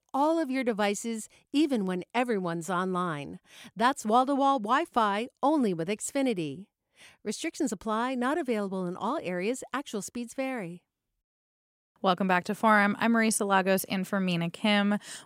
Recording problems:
none

